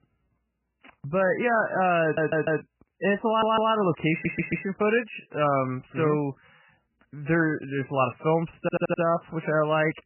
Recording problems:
garbled, watery; badly; nothing above 3 kHz
audio stuttering; 4 times, first at 2 s

